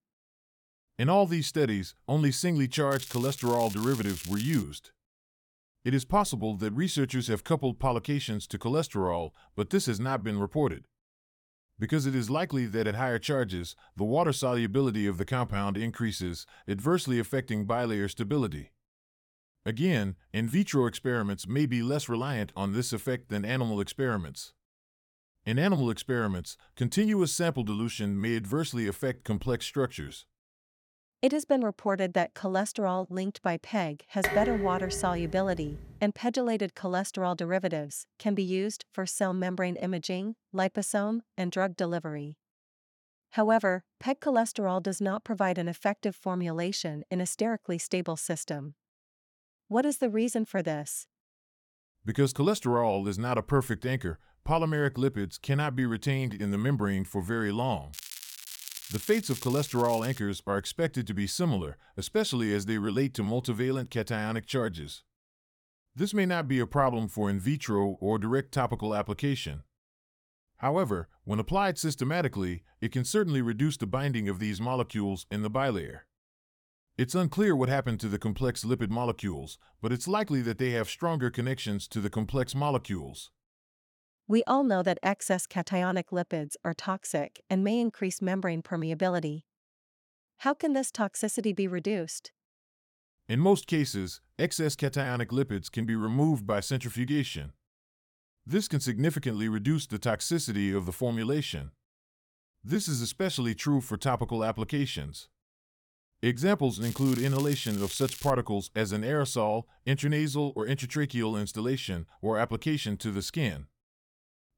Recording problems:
crackling; noticeable; from 3 to 4.5 s, from 58 s to 1:00 and from 1:47 to 1:48; 10 dB below the speech
clattering dishes; loud; from 34 to 36 s; peak level with the speech

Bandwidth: 17.5 kHz